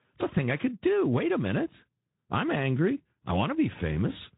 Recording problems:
high frequencies cut off; severe; nothing above 4 kHz
garbled, watery; slightly

